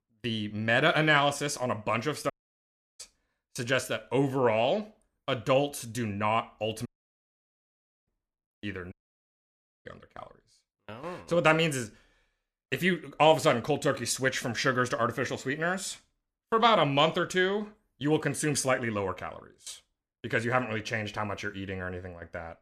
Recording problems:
audio cutting out; at 2.5 s for 0.5 s, at 7 s for 1 s and at 9 s for 1 s

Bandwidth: 14.5 kHz